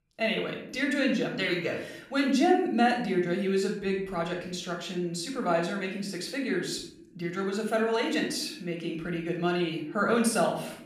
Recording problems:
room echo; noticeable; dies away in 0.6 s
off-mic speech; somewhat distant

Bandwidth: 15 kHz